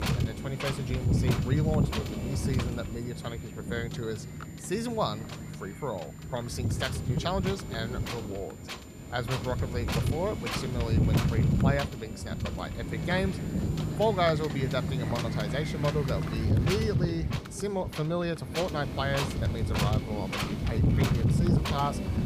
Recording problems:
wind noise on the microphone; heavy; 3 dB below the speech
high-pitched whine; faint; until 15 s; 7 kHz, 20 dB below the speech

